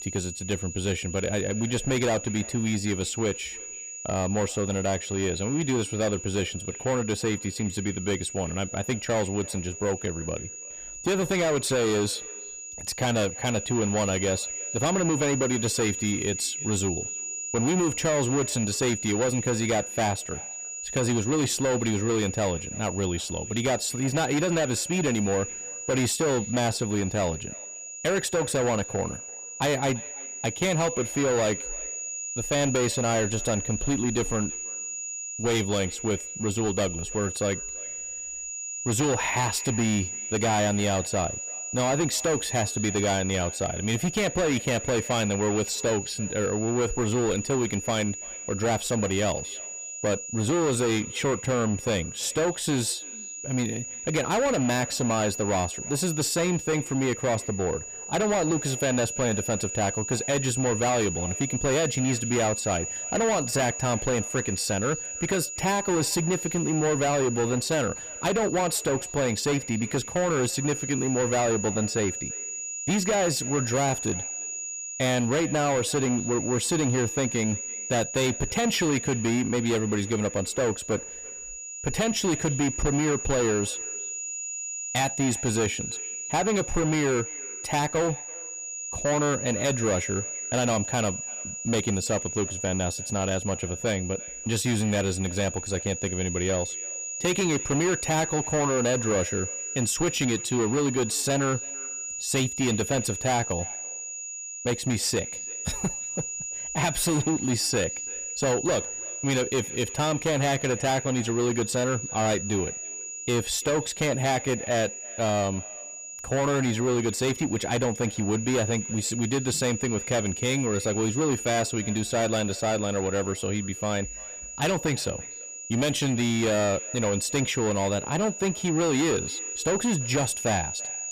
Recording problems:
distortion; heavy; 16% of the sound clipped
echo of what is said; faint; throughout; 340 ms later, 25 dB below the speech
high-pitched whine; loud; throughout; 7 kHz, 6 dB below the speech

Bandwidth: 15.5 kHz